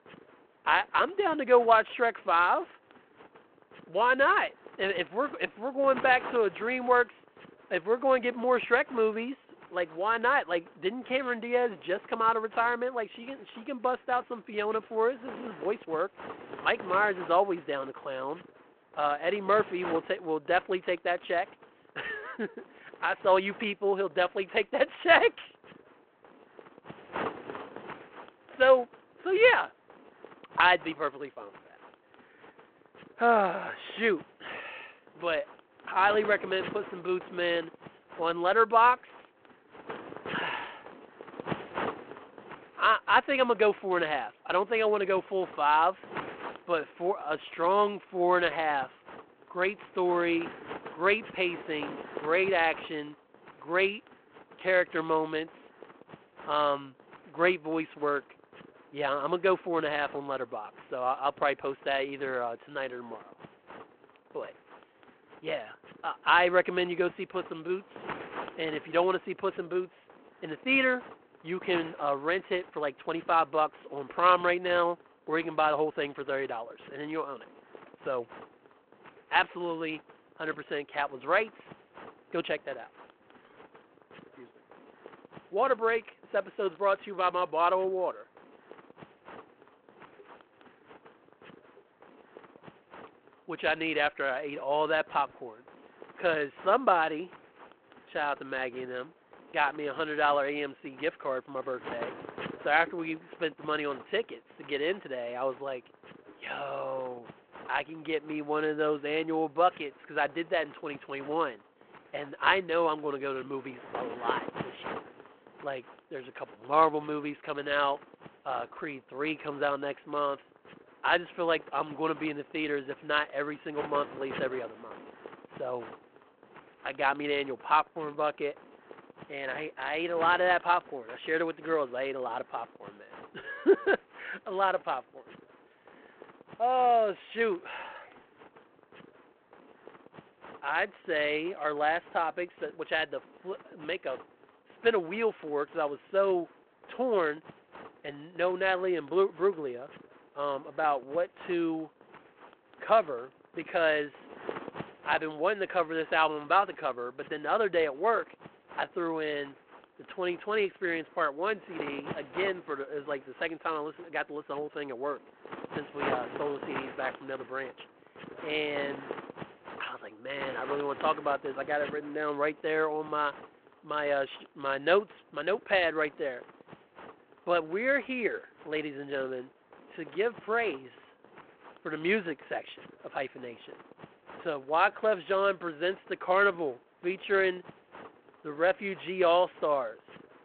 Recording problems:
phone-call audio
wind noise on the microphone; occasional gusts; 20 dB below the speech

